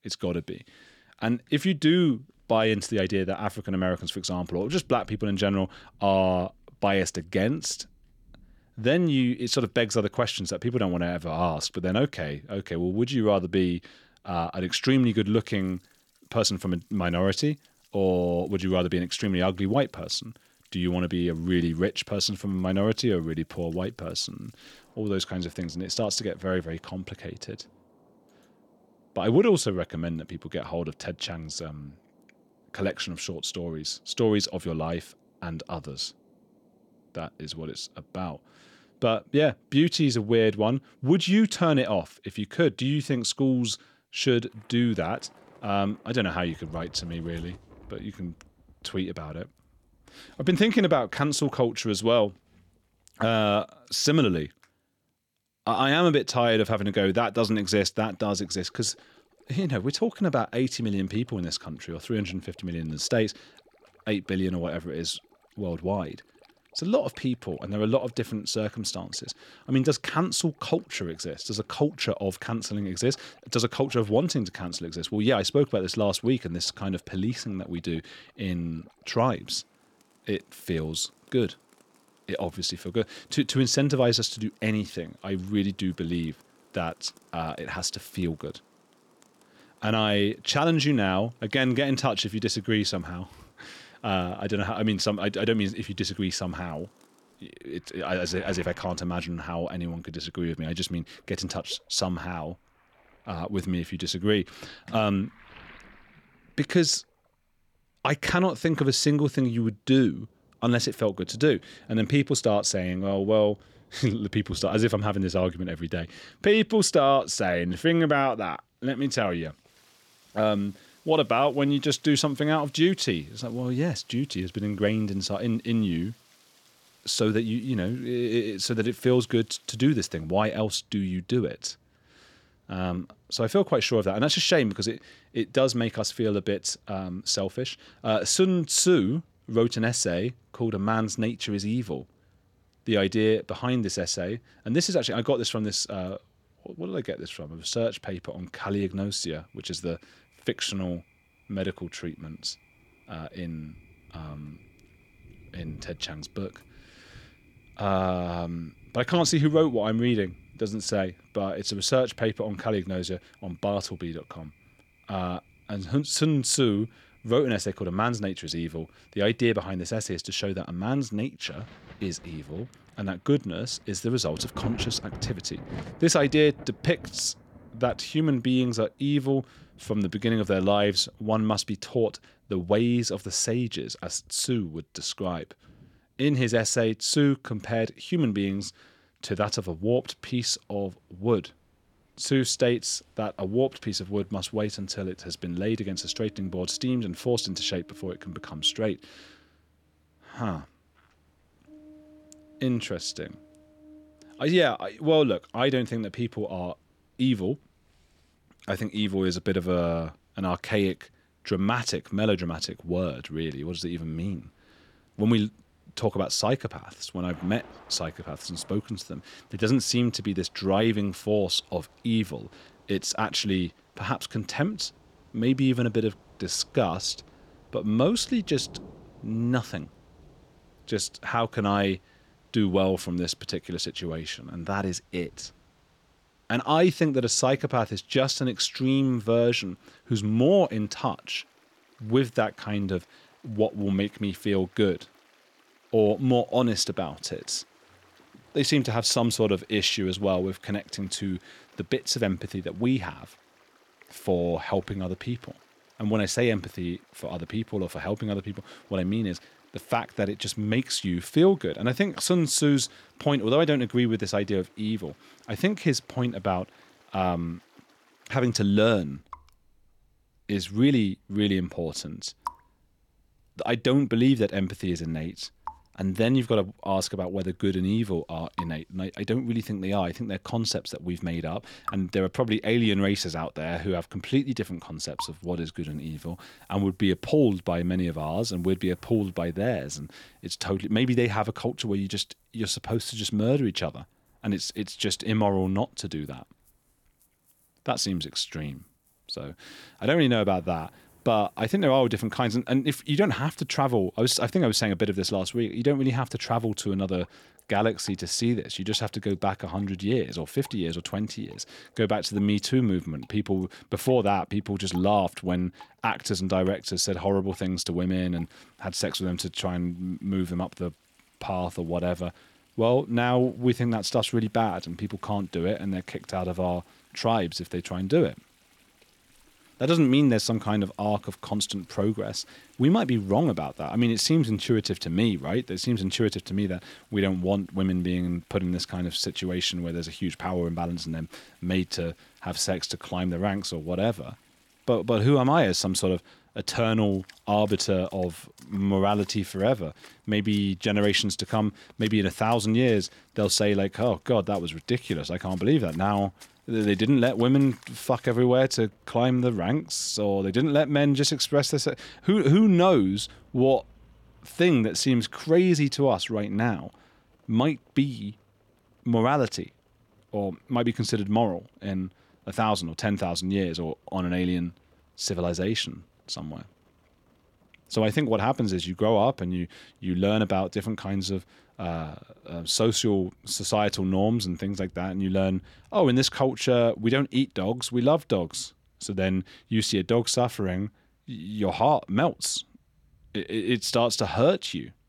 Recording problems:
rain or running water; faint; throughout; 25 dB below the speech

